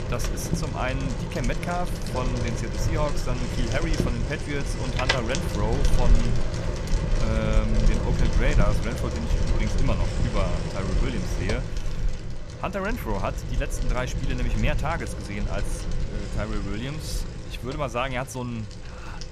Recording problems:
traffic noise; very loud; throughout; 3 dB above the speech

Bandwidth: 14.5 kHz